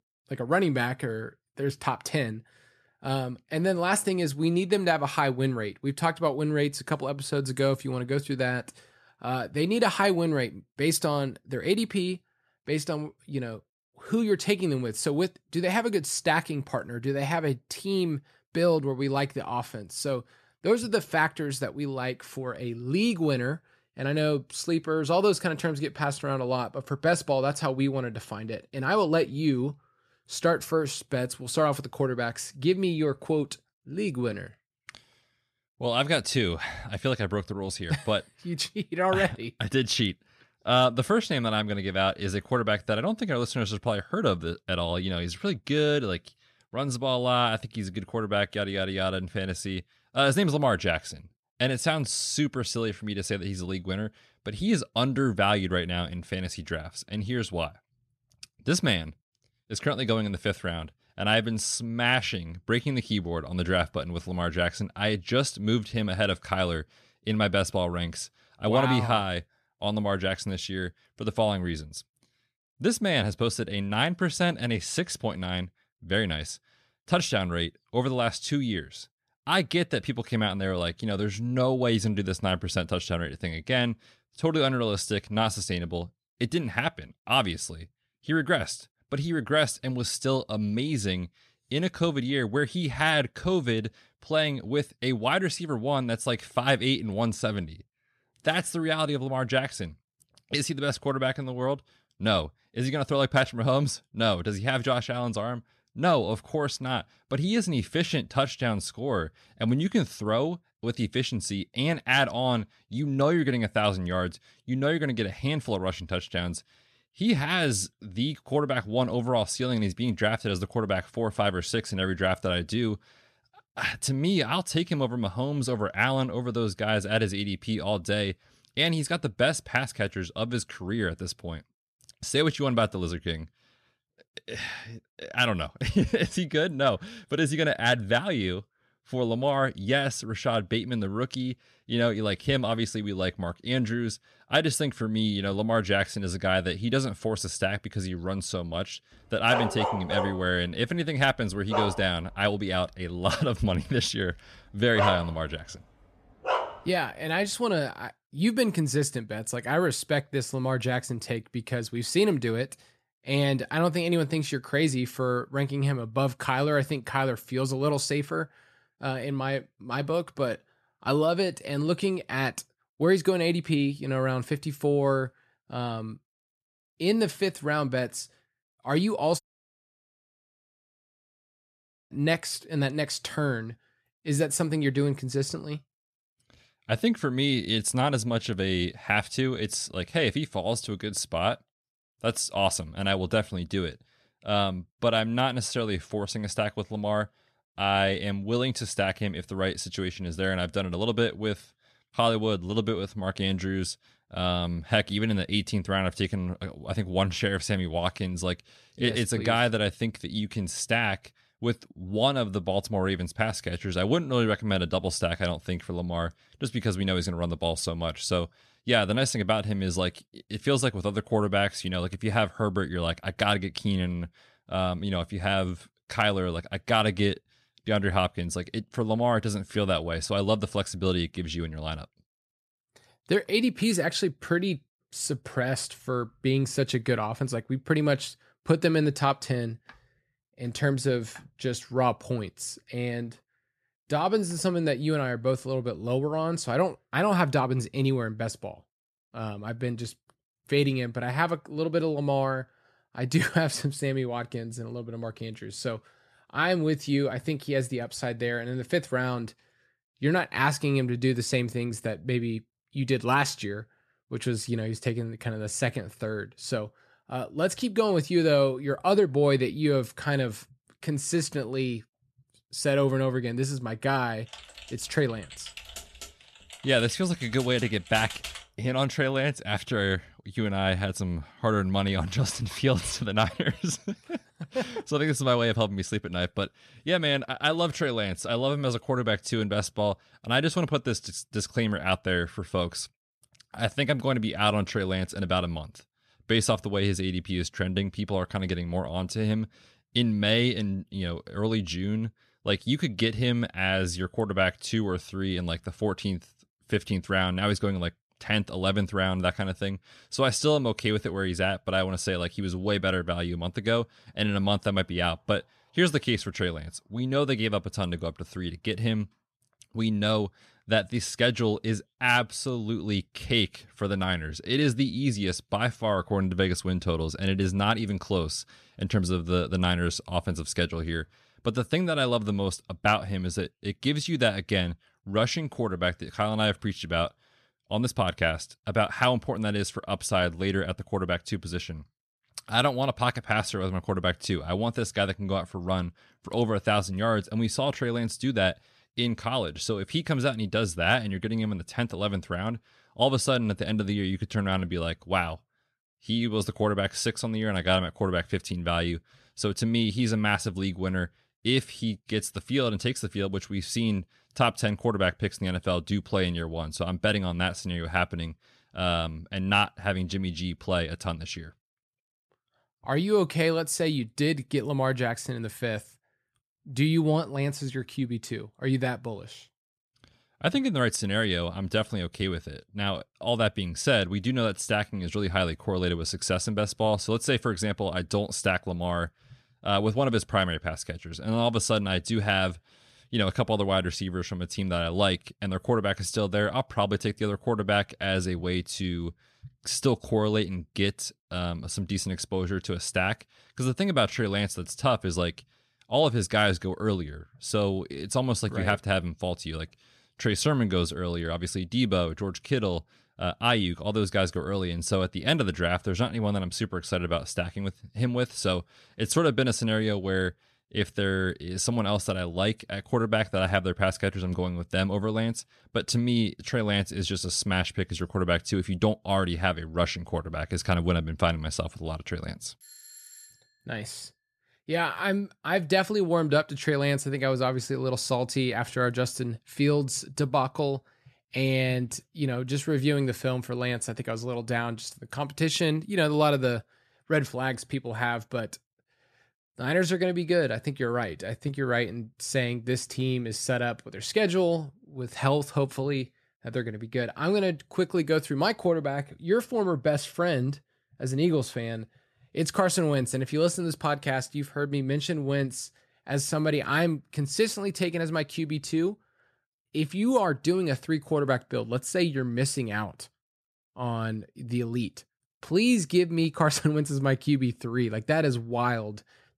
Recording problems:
dog barking; loud; from 2:30 to 2:37; peak level with the speech
audio cutting out; at 2:59 for 2.5 s
keyboard typing; noticeable; from 4:35 to 4:39; peak 7 dB below the speech
doorbell; faint; at 7:13; peak 20 dB below the speech

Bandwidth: 13.5 kHz